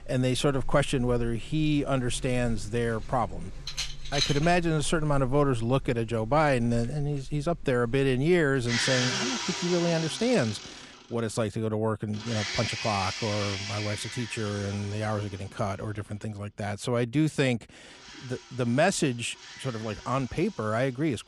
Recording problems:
household noises; loud; throughout; 6 dB below the speech

